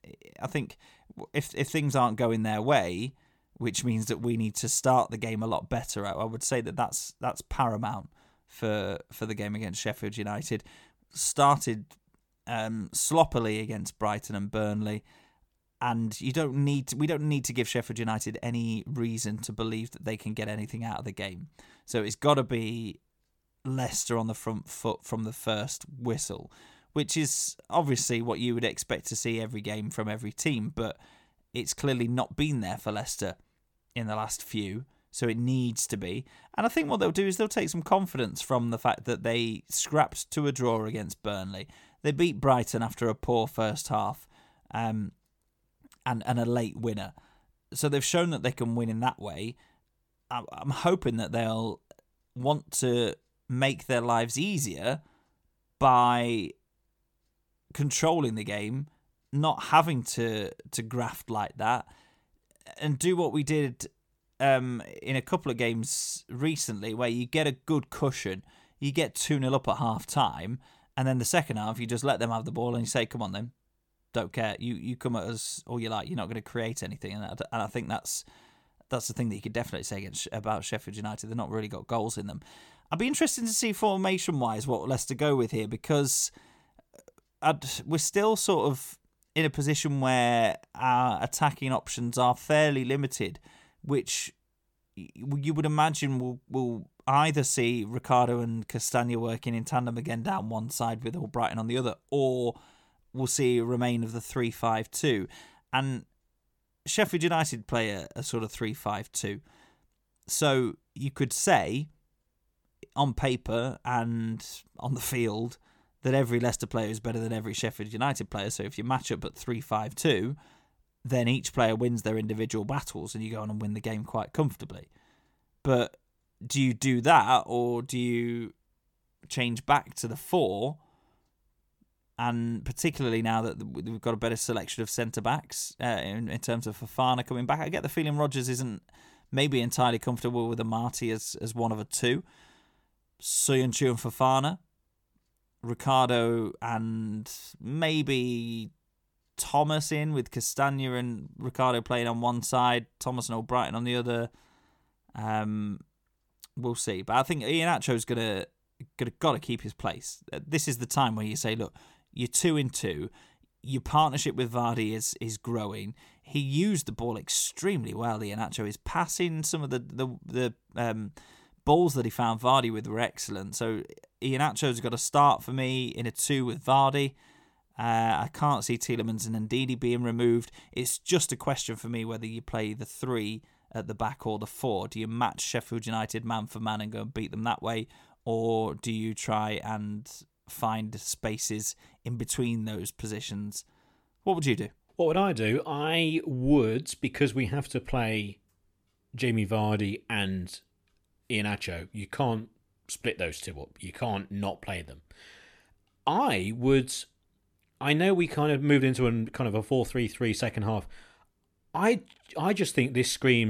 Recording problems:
abrupt cut into speech; at the end

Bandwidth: 18 kHz